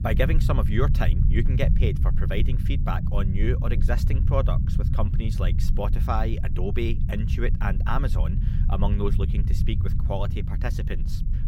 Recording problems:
low rumble; loud; throughout; 7 dB below the speech

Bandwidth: 16 kHz